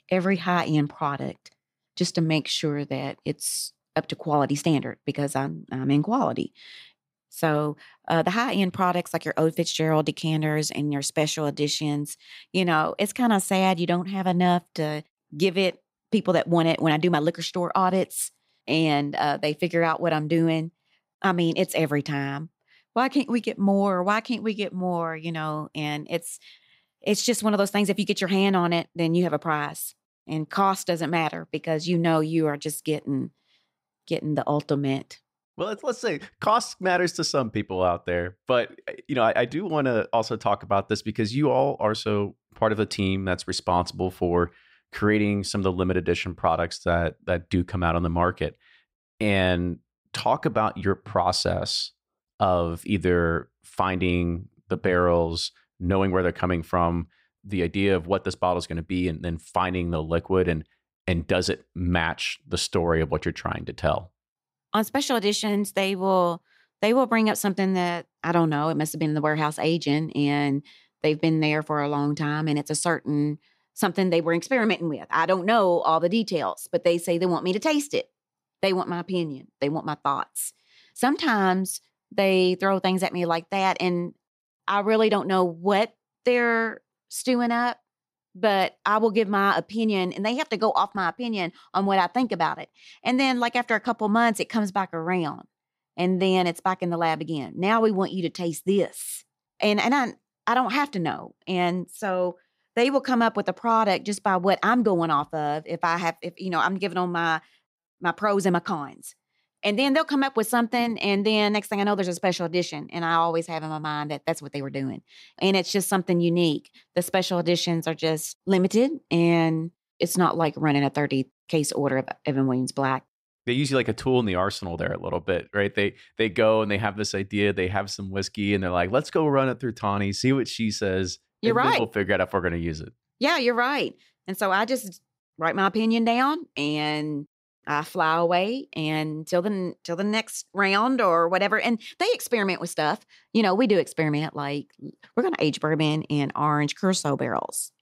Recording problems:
none

